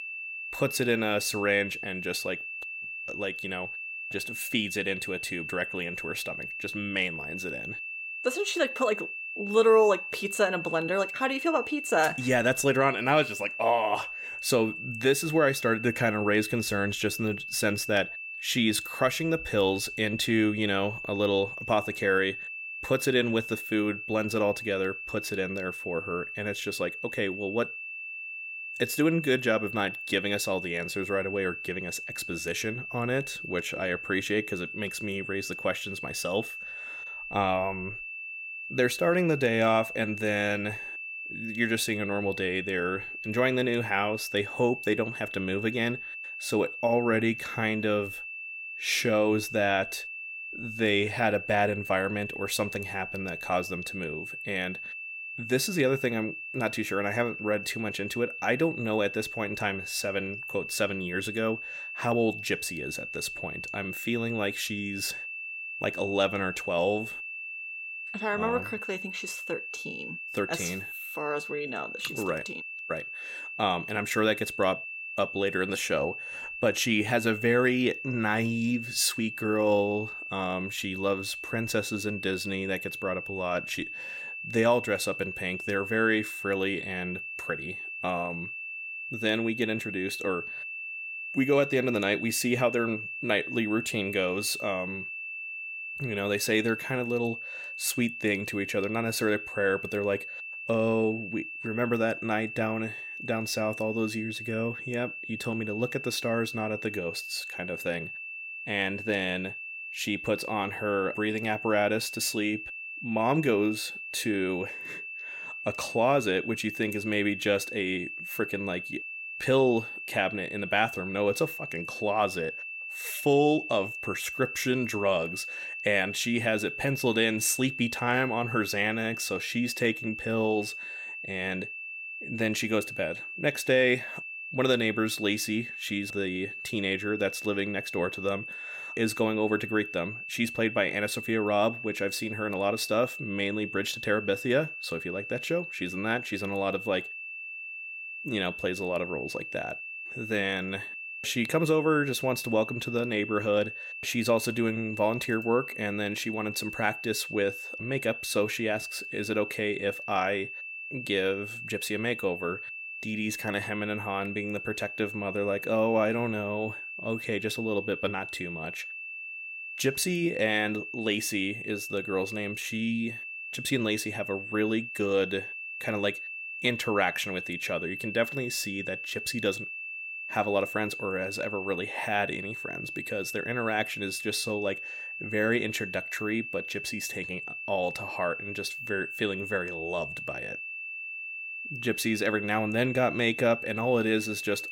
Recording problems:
high-pitched whine; loud; throughout; 2.5 kHz, 7 dB below the speech

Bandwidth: 16.5 kHz